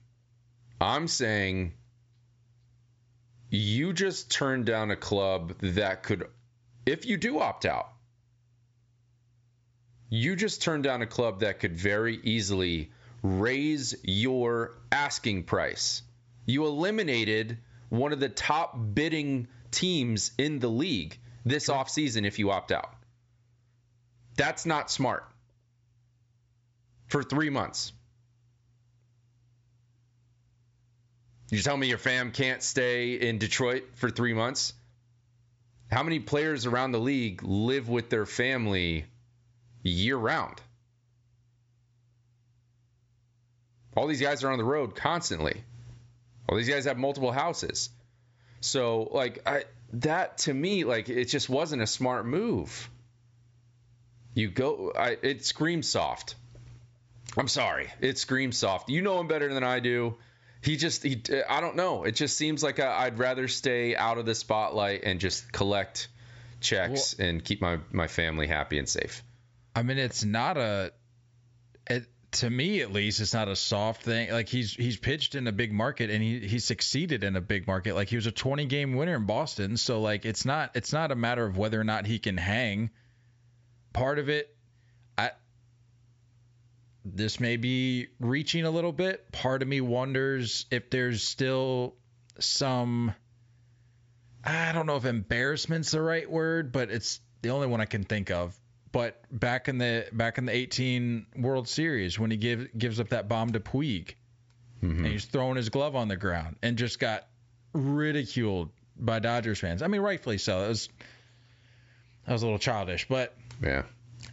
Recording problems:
high frequencies cut off; noticeable; nothing above 8 kHz
squashed, flat; somewhat

